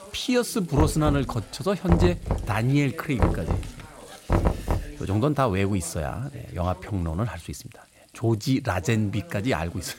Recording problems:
voice in the background; noticeable; throughout; 20 dB below the speech
household noises; faint; throughout; 25 dB below the speech
door banging; loud; from 1 to 5 s; peak 1 dB above the speech

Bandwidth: 16 kHz